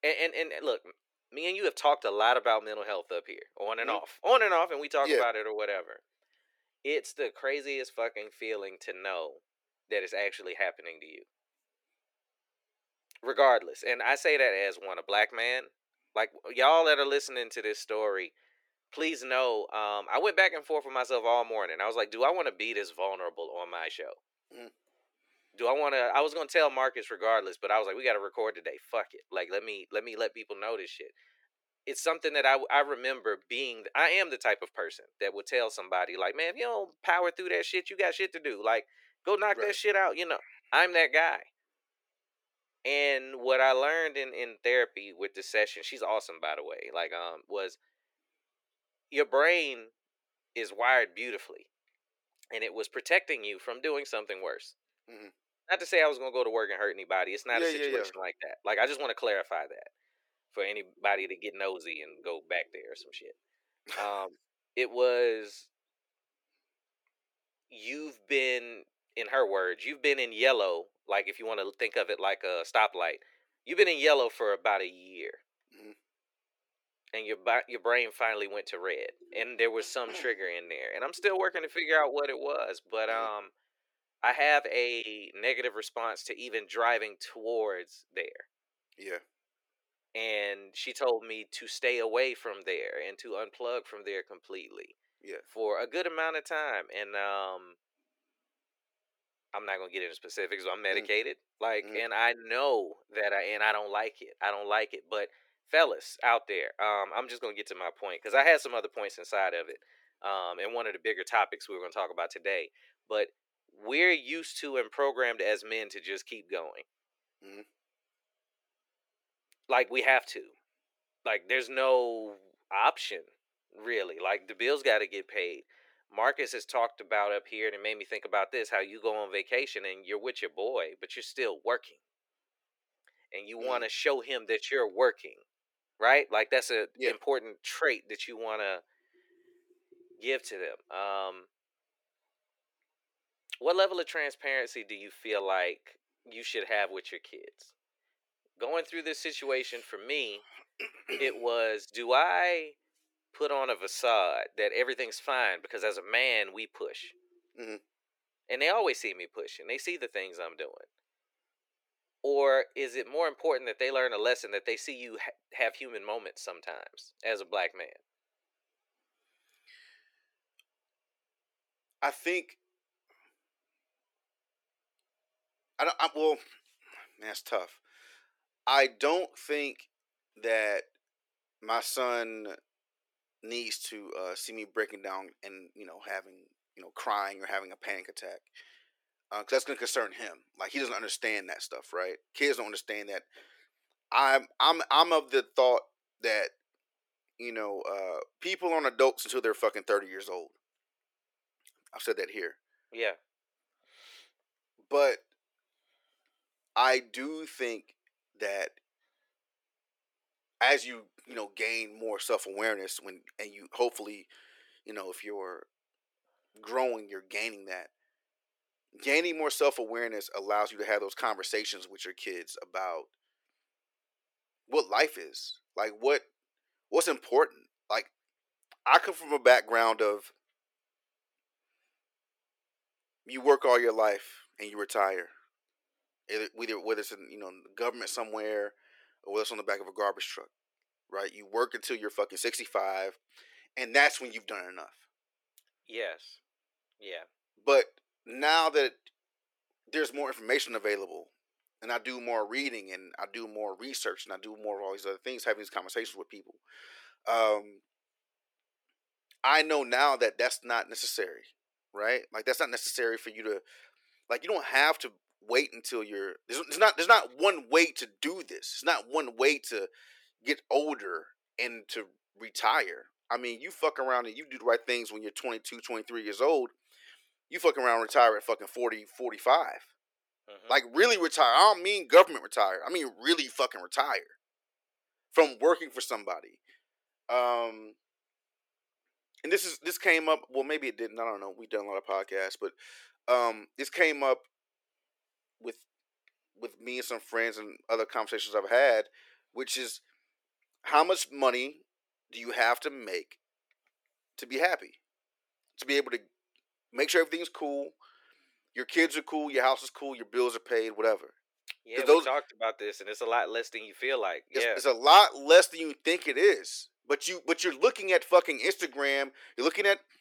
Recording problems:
thin; very; fading below 400 Hz

